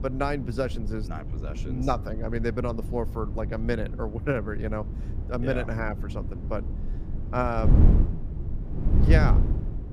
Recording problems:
wind noise on the microphone; heavy; 9 dB below the speech

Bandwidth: 15 kHz